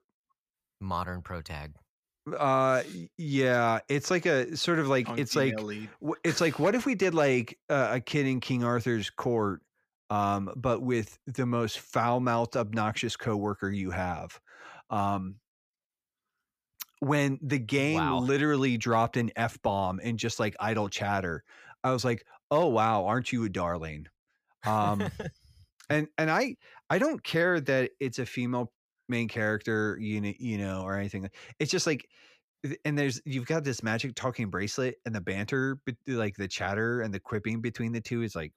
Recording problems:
none

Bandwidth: 15 kHz